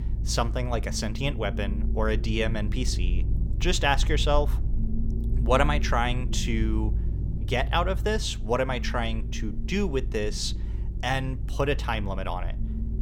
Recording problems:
low rumble; noticeable; throughout; 15 dB below the speech

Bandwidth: 17 kHz